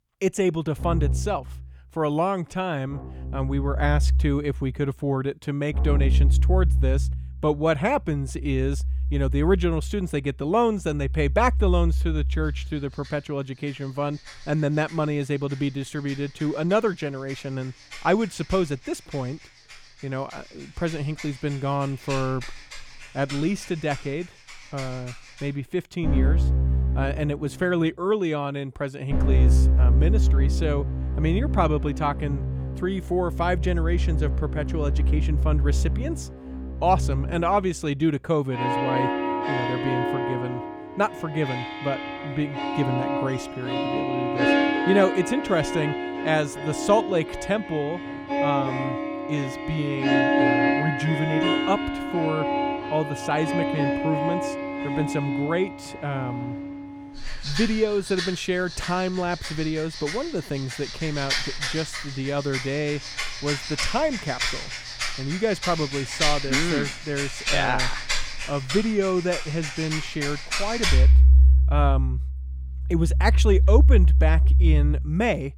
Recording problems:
background music; very loud; throughout; 2 dB above the speech

